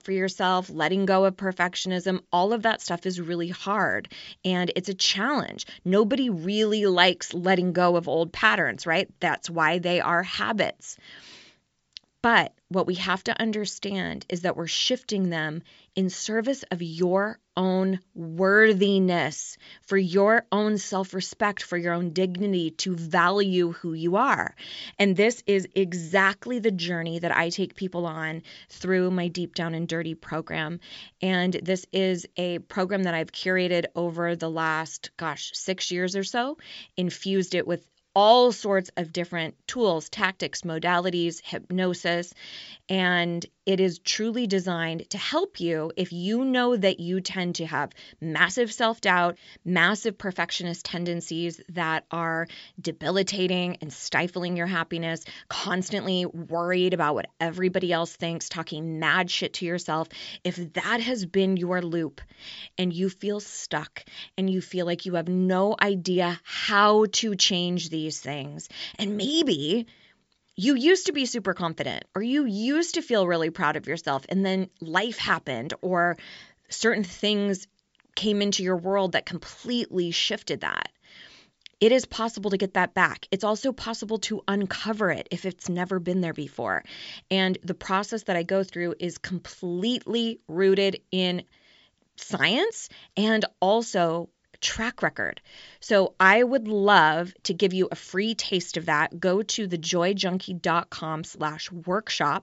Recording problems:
high frequencies cut off; noticeable; nothing above 8 kHz

